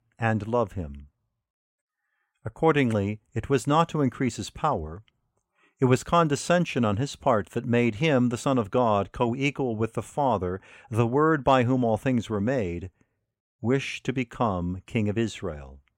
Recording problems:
none

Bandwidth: 16 kHz